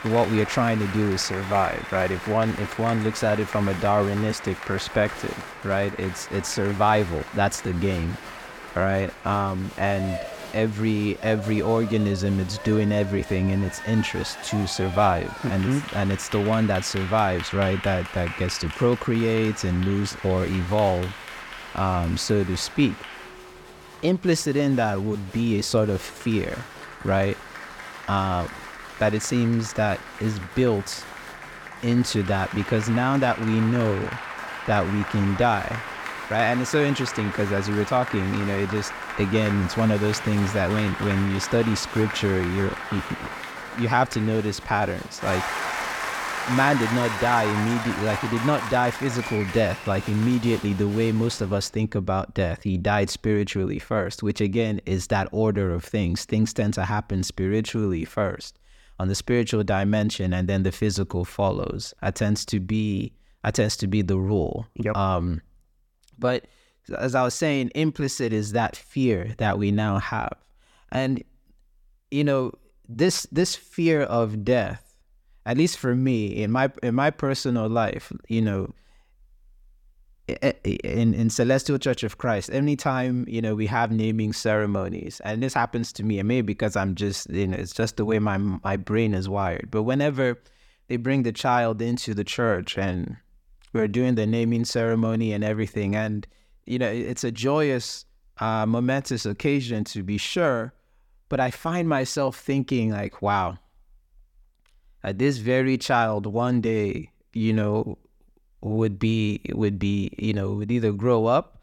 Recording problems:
crowd noise; loud; until 51 s; 9 dB below the speech

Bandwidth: 17.5 kHz